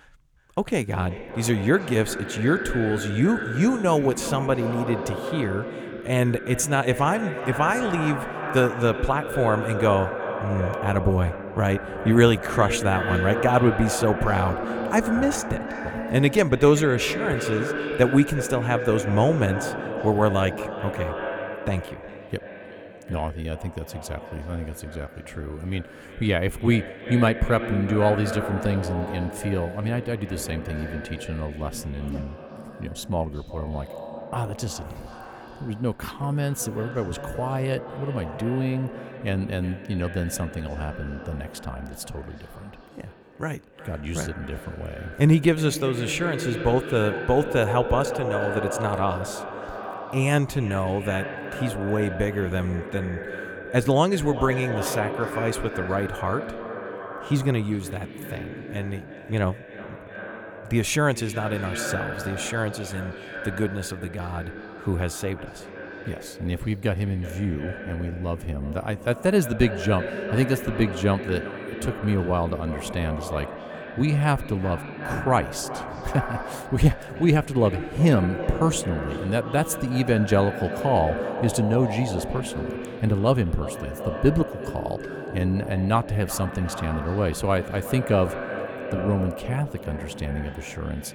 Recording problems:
echo of what is said; strong; throughout; 370 ms later, 8 dB below the speech

